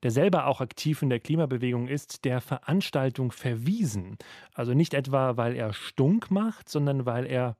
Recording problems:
none

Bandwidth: 14.5 kHz